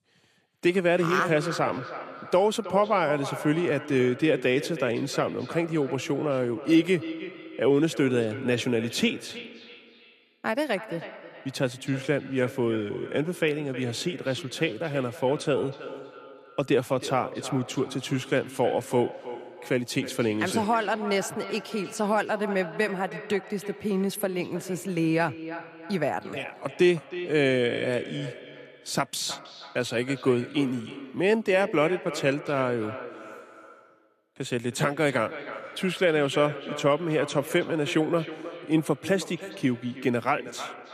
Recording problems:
echo of what is said; noticeable; throughout; 320 ms later, 15 dB below the speech

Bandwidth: 14.5 kHz